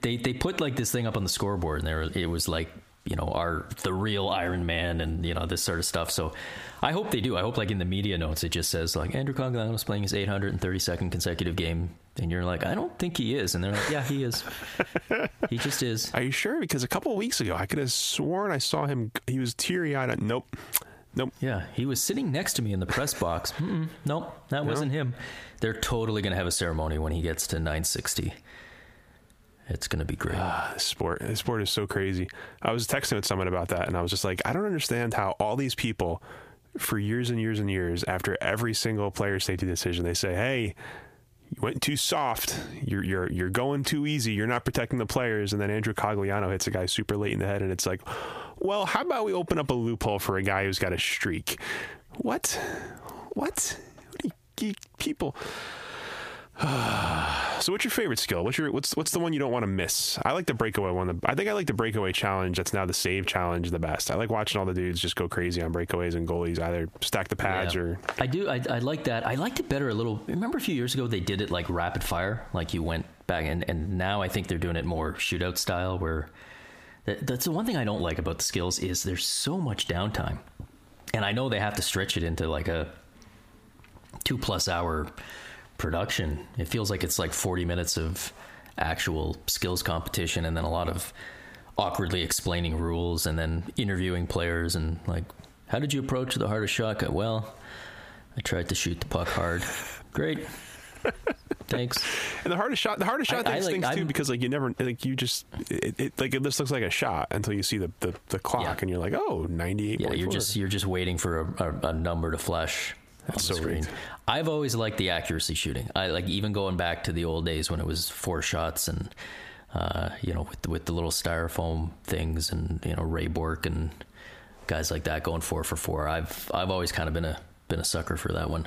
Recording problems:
squashed, flat; heavily

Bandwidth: 15 kHz